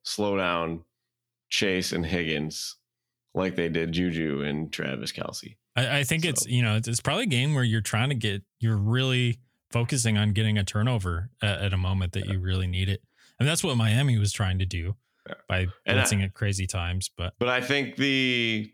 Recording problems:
none

